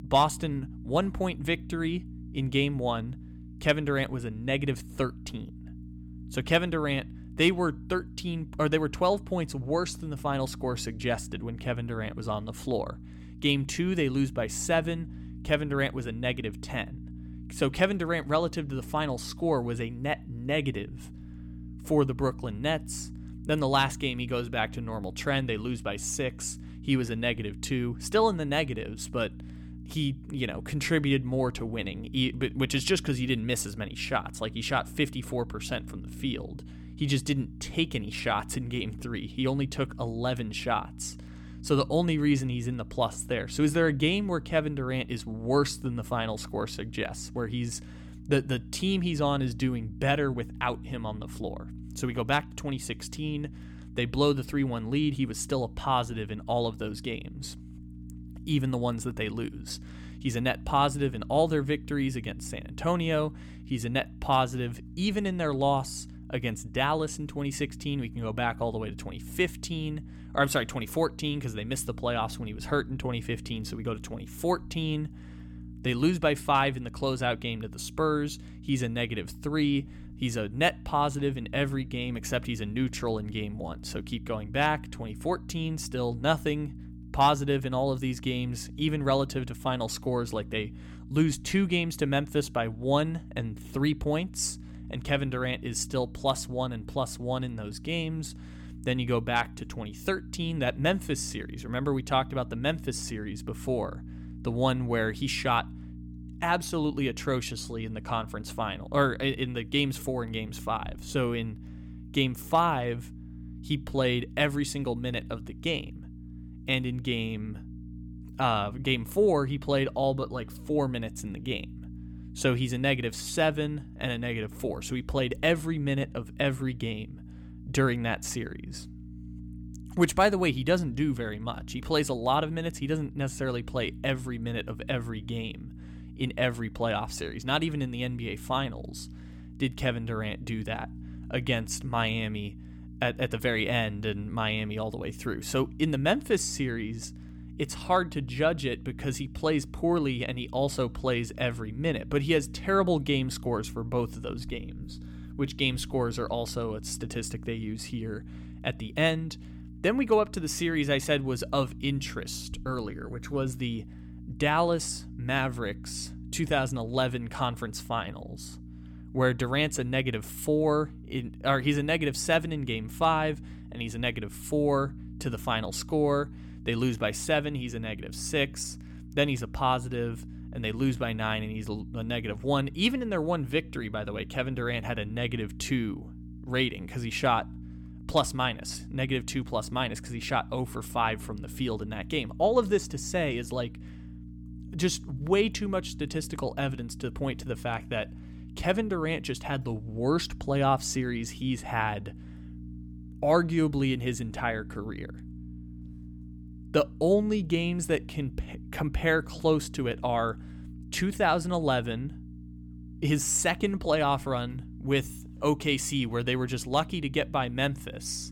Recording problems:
electrical hum; faint; throughout; 60 Hz, 20 dB below the speech

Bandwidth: 17 kHz